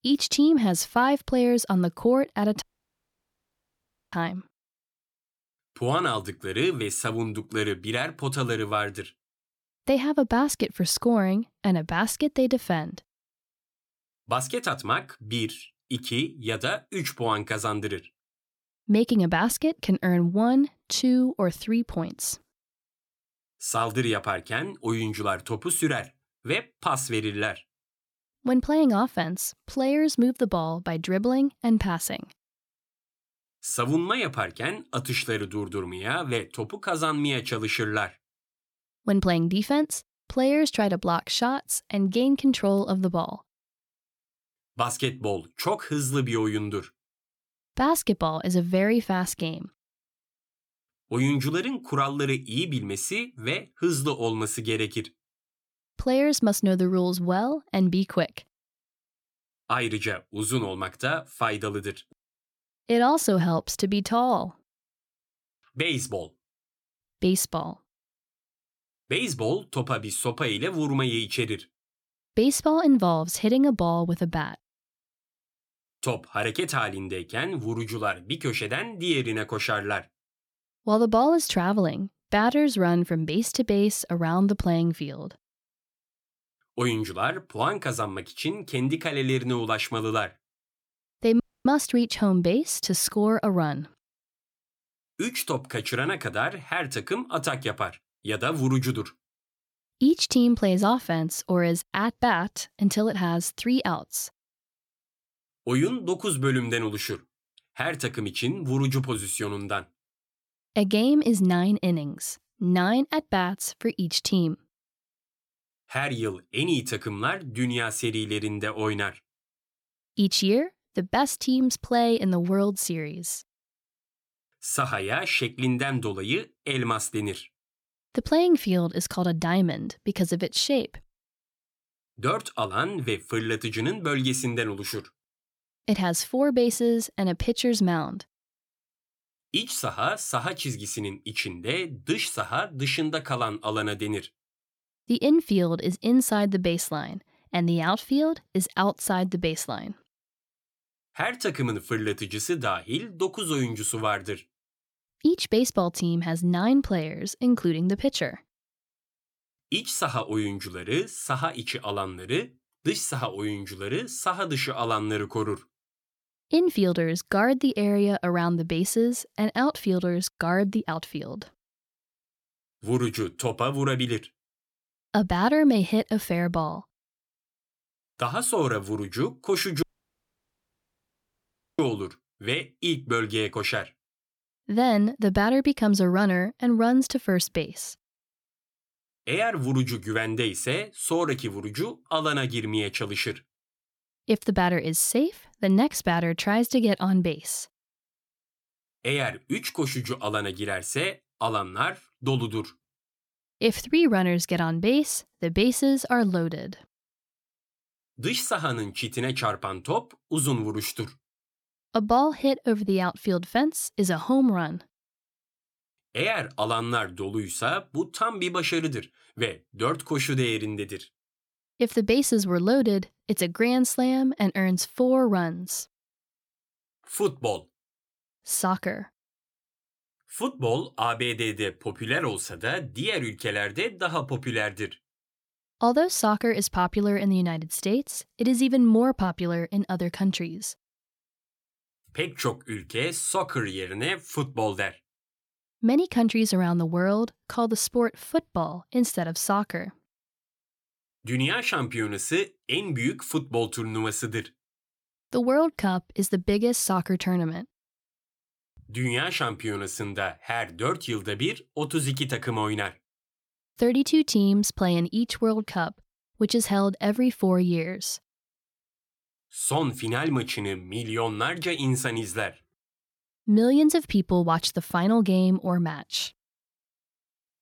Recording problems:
audio cutting out; at 2.5 s for 1.5 s, at 1:31 and at 3:00 for 2 s

